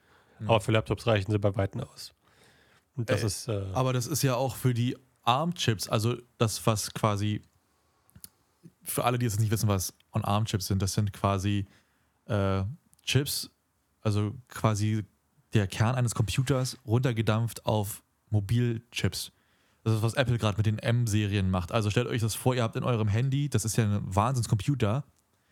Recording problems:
none

